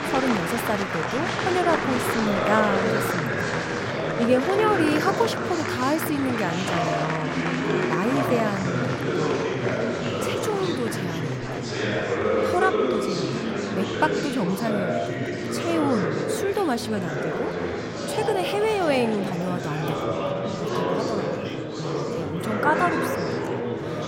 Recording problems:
murmuring crowd; very loud; throughout; 1 dB above the speech

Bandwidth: 16 kHz